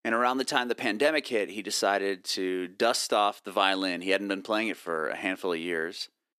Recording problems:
thin; somewhat; fading below 300 Hz

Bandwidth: 14 kHz